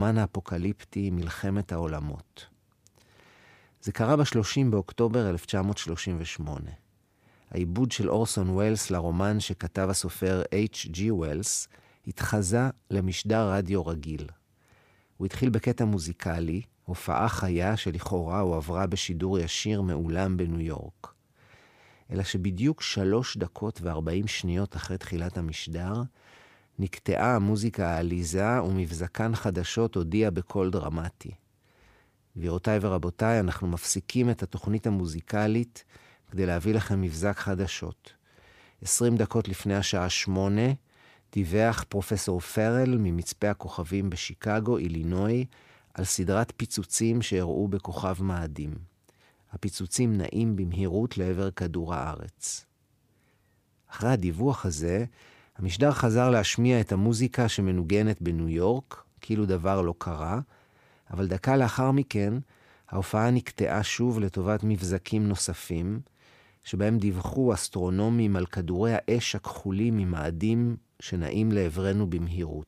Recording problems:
abrupt cut into speech; at the start

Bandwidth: 15 kHz